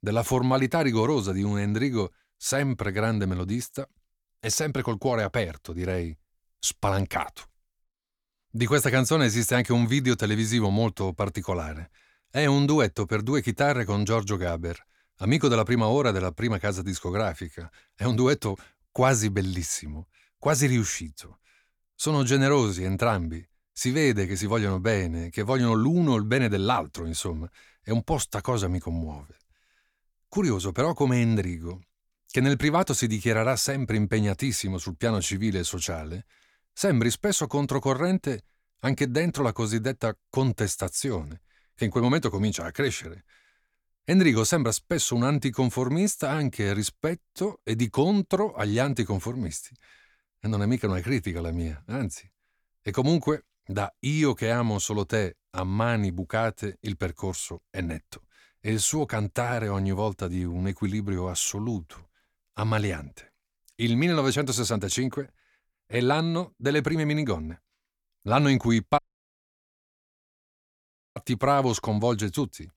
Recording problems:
audio cutting out; at 1:09 for 2 s

